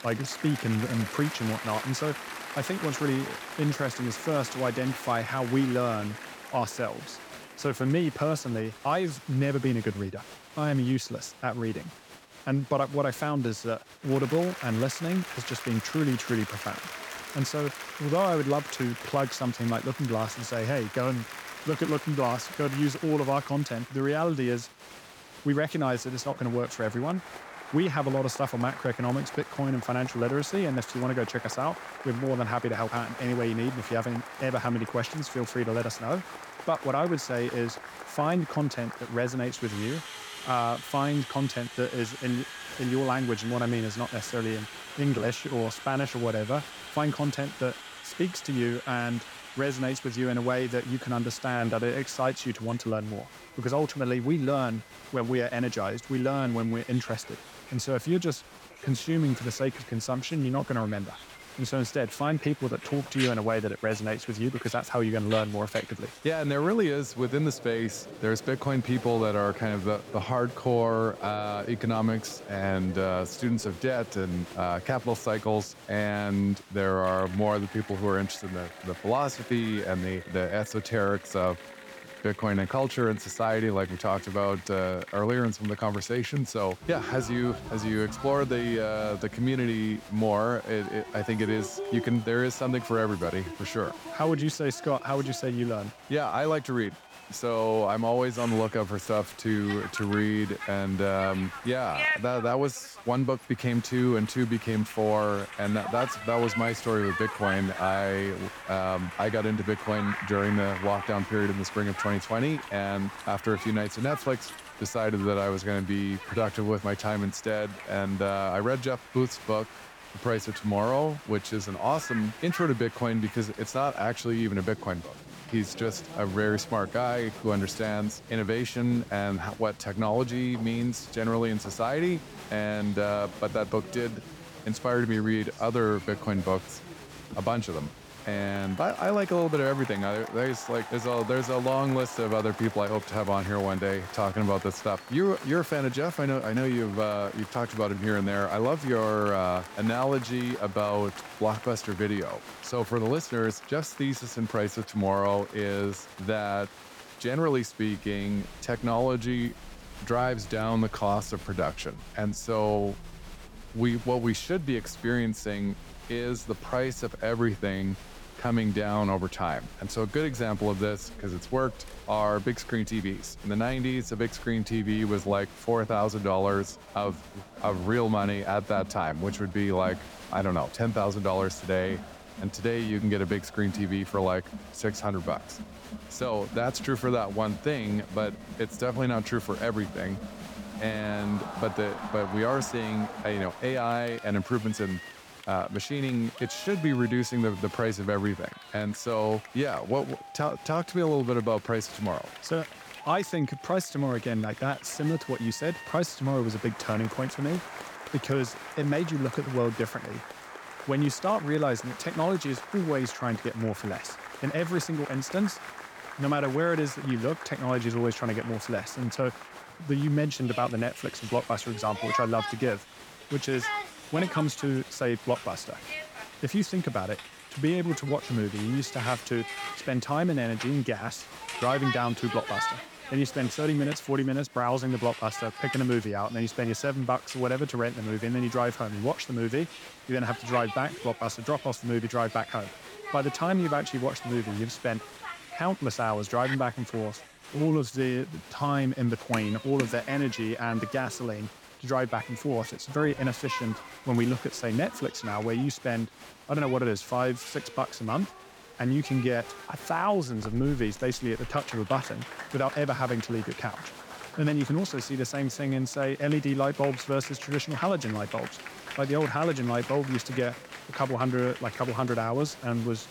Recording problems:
crowd noise; noticeable; throughout; 10 dB below the speech

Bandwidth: 18.5 kHz